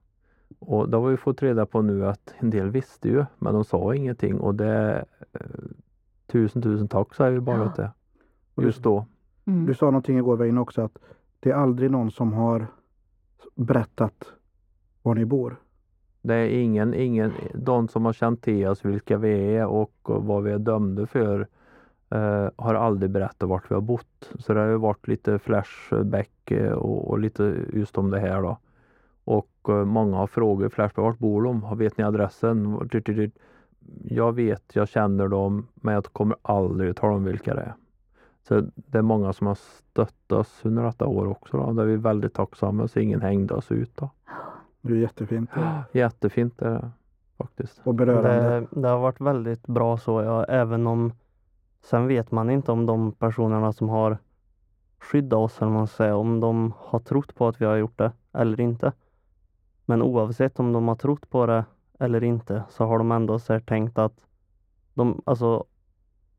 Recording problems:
muffled; very; fading above 2.5 kHz

